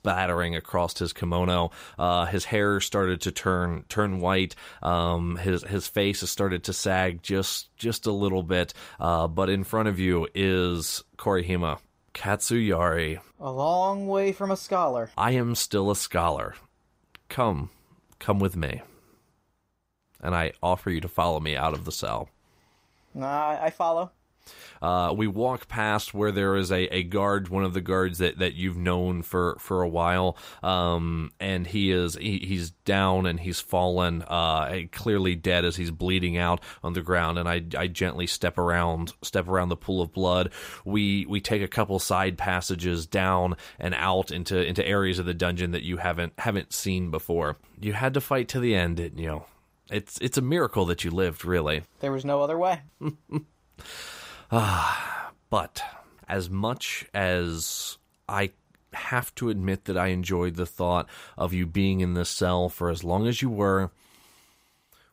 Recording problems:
none

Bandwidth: 15.5 kHz